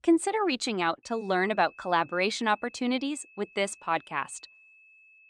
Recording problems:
high-pitched whine; faint; from 1 s on; 2.5 kHz, 25 dB below the speech

